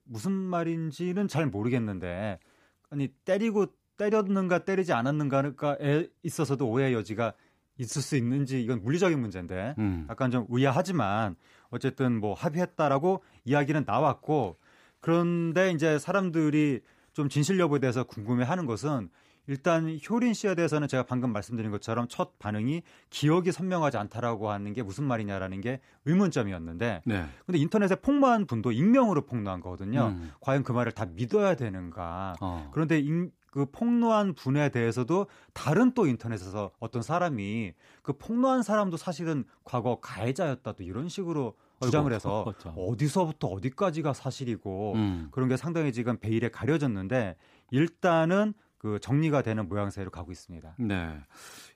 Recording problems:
uneven, jittery; strongly; from 4 to 47 s

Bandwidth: 15 kHz